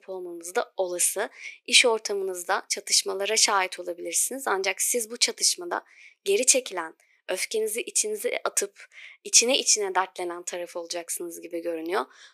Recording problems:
thin; very; fading below 350 Hz

